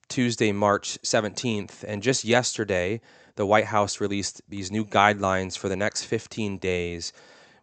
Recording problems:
high frequencies cut off; noticeable; nothing above 8 kHz

